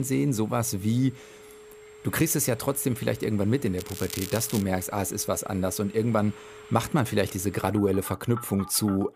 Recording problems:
alarms or sirens; noticeable; throughout; 20 dB below the speech
crackling; noticeable; at 4 s; 10 dB below the speech
abrupt cut into speech; at the start

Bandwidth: 15 kHz